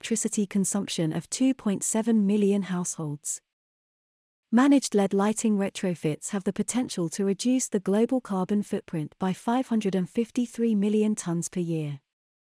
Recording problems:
none

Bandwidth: 14.5 kHz